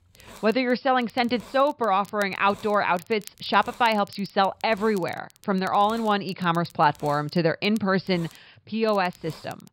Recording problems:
high frequencies cut off; noticeable; nothing above 5 kHz
hiss; faint; throughout; 25 dB below the speech
crackle, like an old record; faint; 25 dB below the speech

